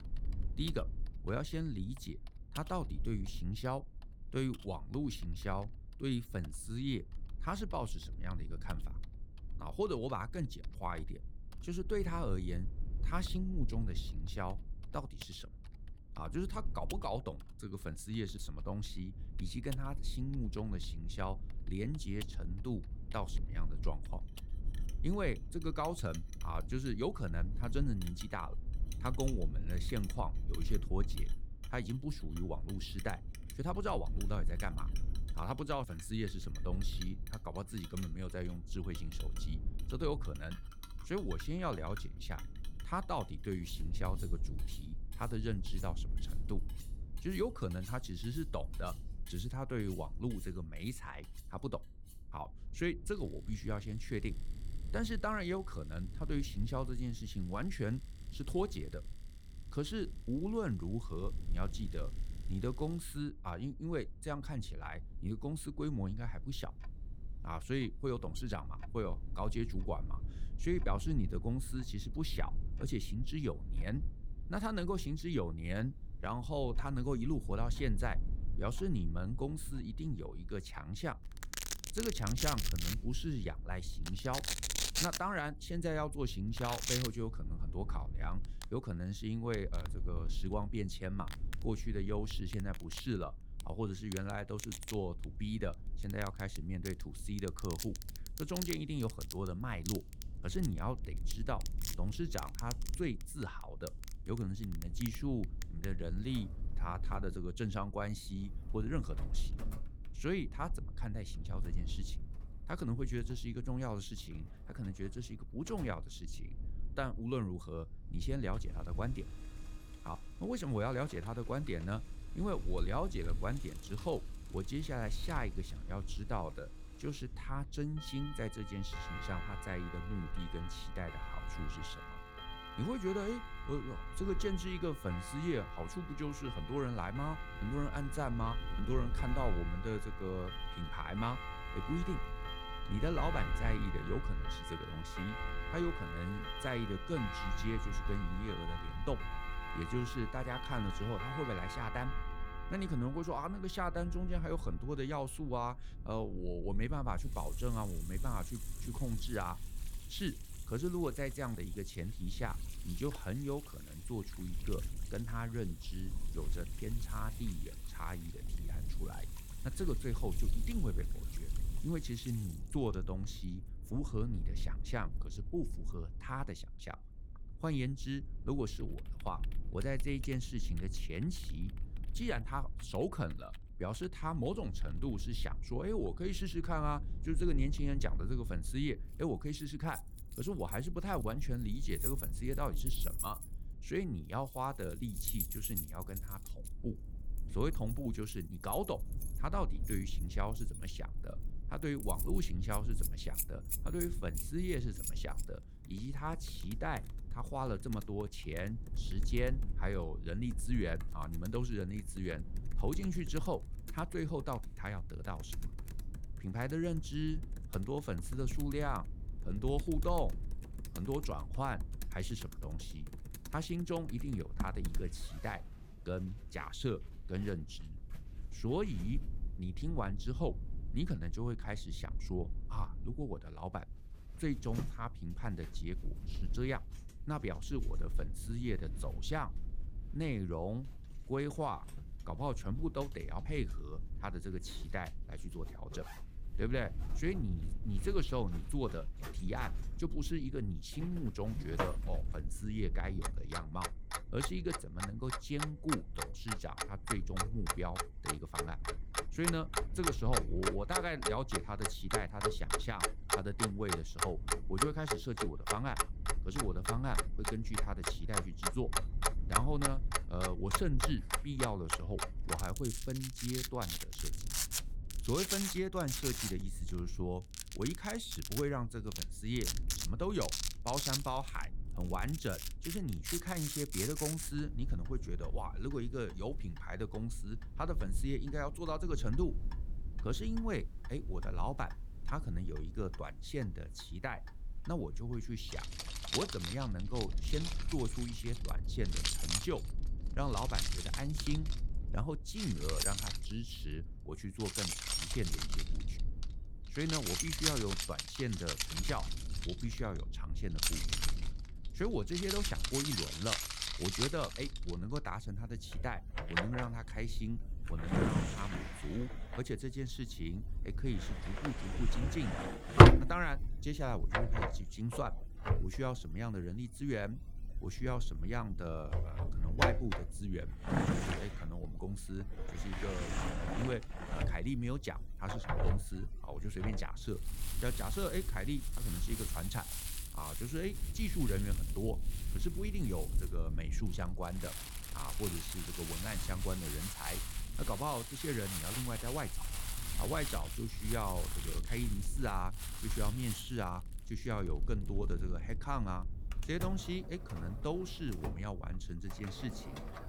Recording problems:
household noises; very loud; throughout; as loud as the speech
low rumble; noticeable; throughout; 20 dB below the speech

